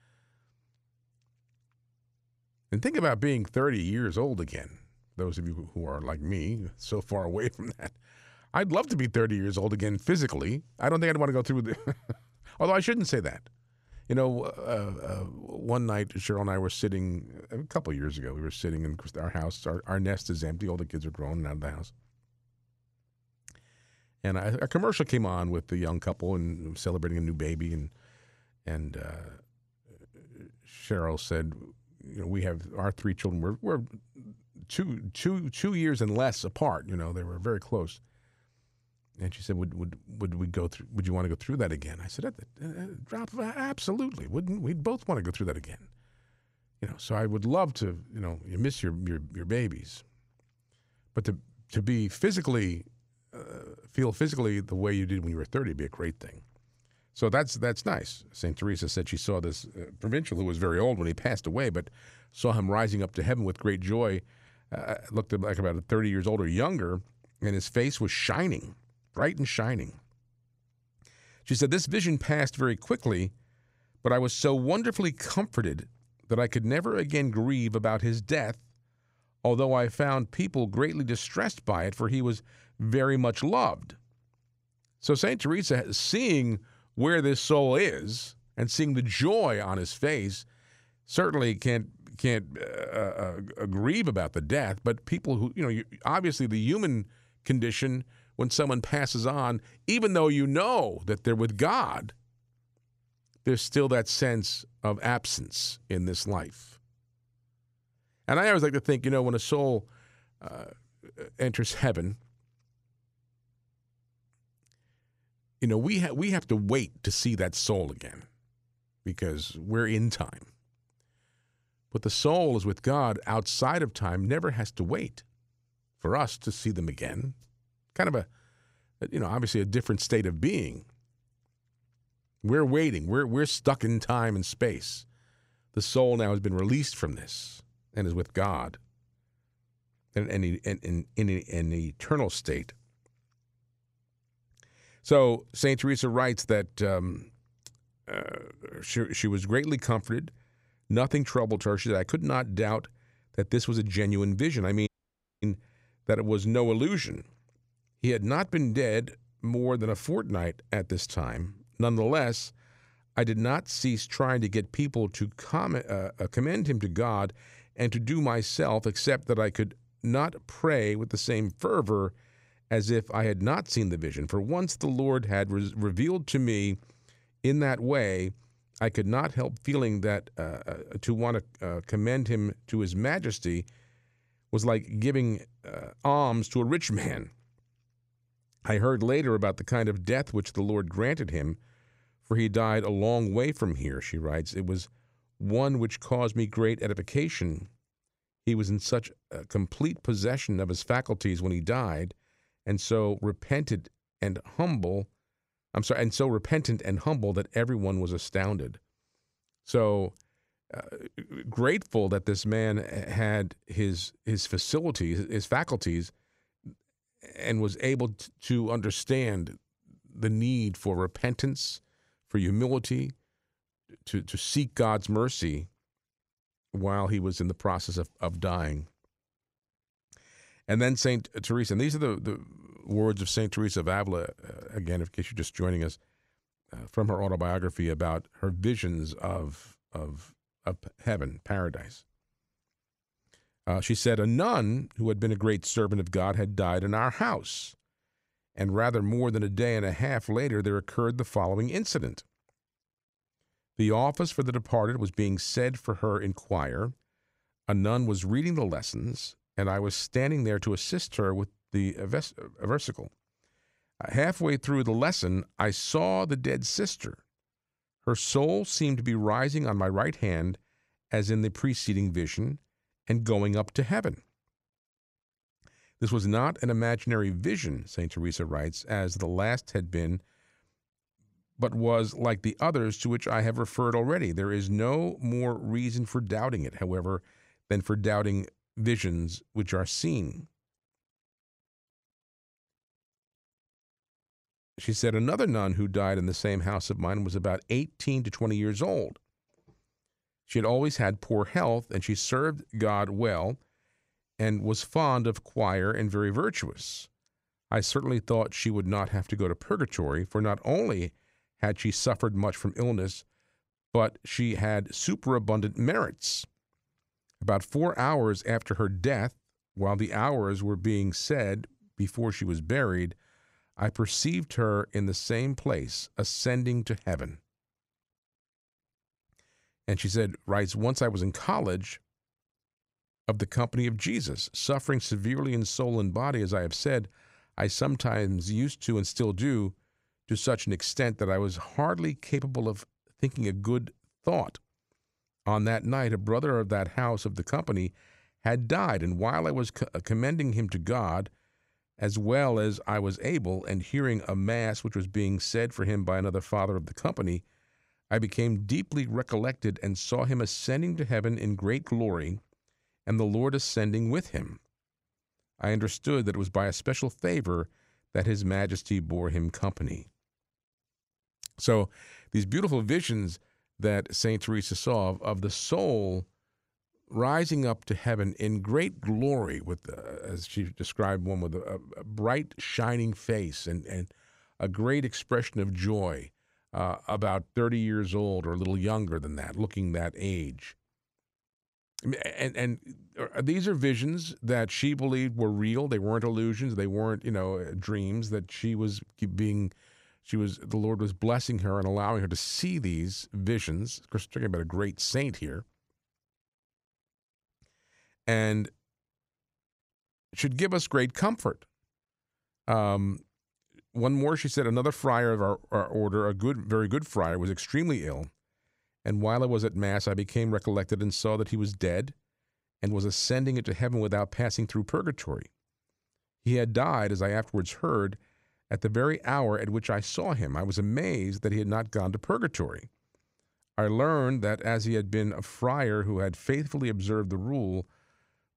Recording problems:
audio cutting out; at 2:35 for 0.5 s

